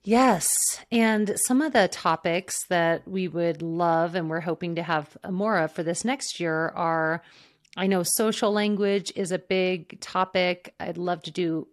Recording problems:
none

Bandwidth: 13.5 kHz